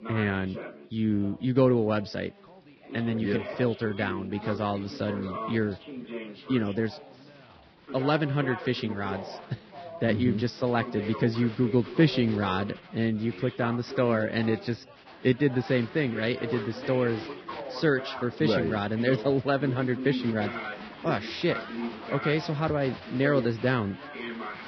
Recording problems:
garbled, watery; badly; nothing above 5.5 kHz
crowd noise; noticeable; throughout; 20 dB below the speech
background chatter; noticeable; throughout; 3 voices, 10 dB below the speech

